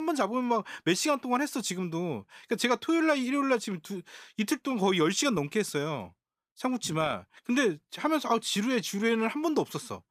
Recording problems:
abrupt cut into speech; at the start

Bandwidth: 15 kHz